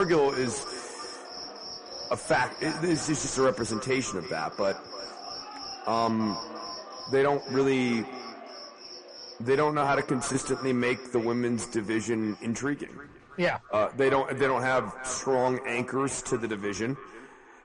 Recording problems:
echo of what is said; noticeable; throughout; 330 ms later, 15 dB below the speech
distortion; slight; 10 dB below the speech
garbled, watery; slightly; nothing above 10 kHz
animal sounds; noticeable; throughout; 15 dB below the speech
abrupt cut into speech; at the start

